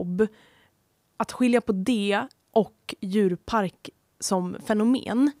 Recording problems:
abrupt cut into speech; at the start

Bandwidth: 15.5 kHz